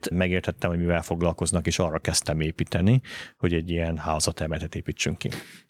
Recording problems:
none

